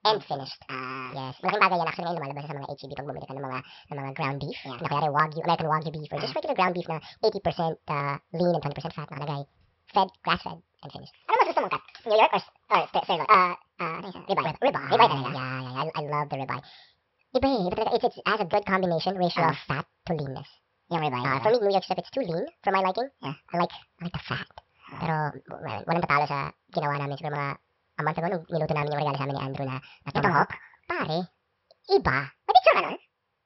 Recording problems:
wrong speed and pitch; too fast and too high; 1.7 times normal speed
high frequencies cut off; noticeable; nothing above 5.5 kHz

